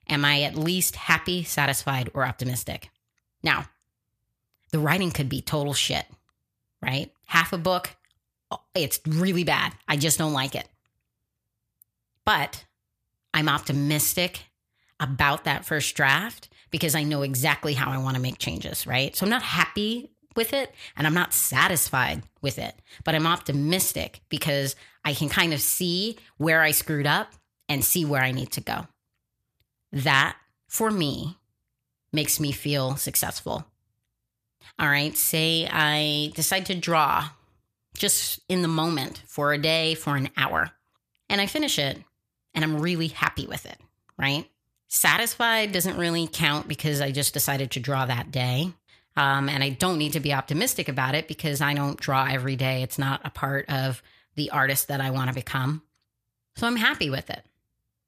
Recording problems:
none

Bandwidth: 14.5 kHz